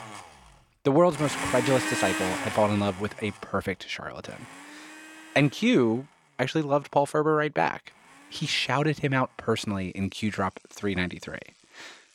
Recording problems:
household noises; loud; throughout; 7 dB below the speech

